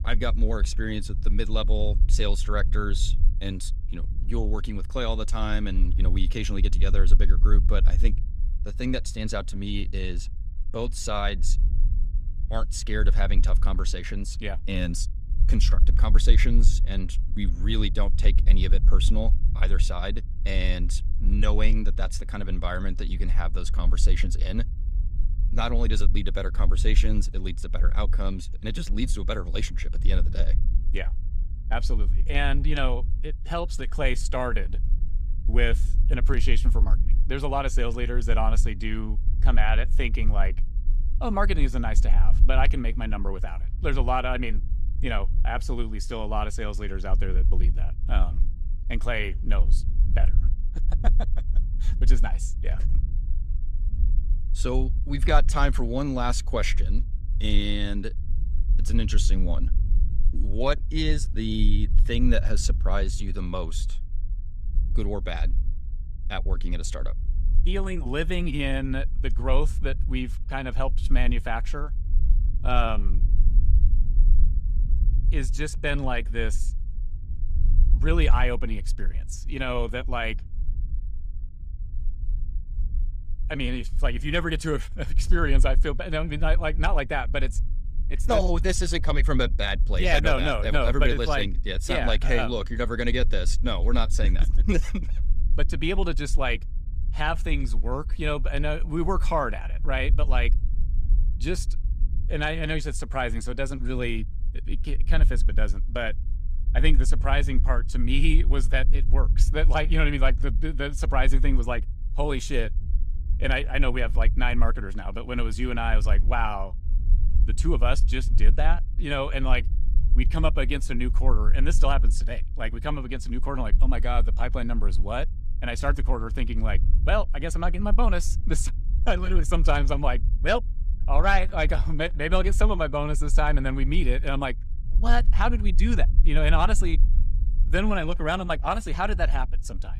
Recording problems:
low rumble; noticeable; throughout; 20 dB below the speech

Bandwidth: 15 kHz